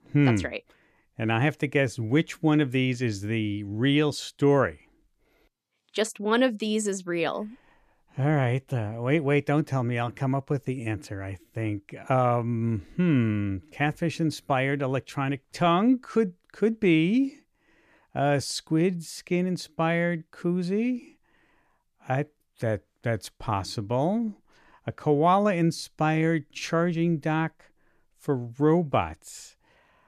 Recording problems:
none

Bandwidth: 14.5 kHz